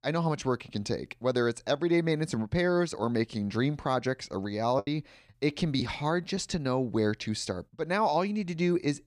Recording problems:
choppy; very; from 5 to 6.5 s; 6% of the speech affected

